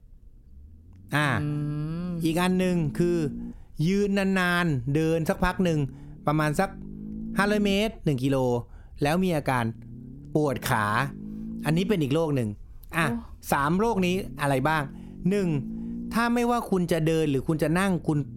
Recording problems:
low rumble; noticeable; throughout; 20 dB below the speech

